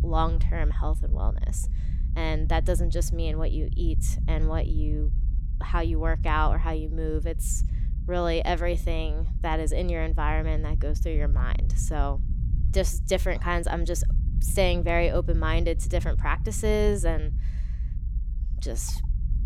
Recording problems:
low rumble; noticeable; throughout; 15 dB below the speech

